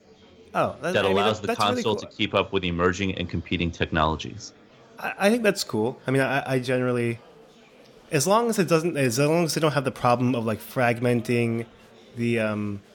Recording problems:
murmuring crowd; faint; throughout; 25 dB below the speech

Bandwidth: 17.5 kHz